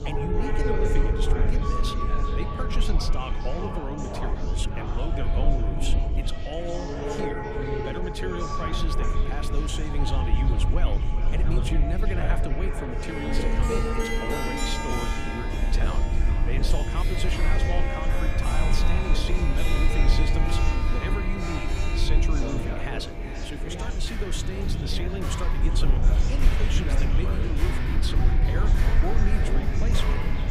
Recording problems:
echo of what is said; strong; throughout; 400 ms later, 8 dB below the speech
background music; very loud; throughout; 1 dB above the speech
chatter from many people; loud; throughout; 3 dB below the speech
low rumble; loud; throughout; 9 dB below the speech

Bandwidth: 15 kHz